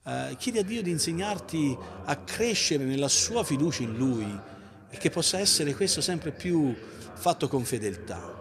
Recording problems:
voice in the background; noticeable; throughout; 15 dB below the speech

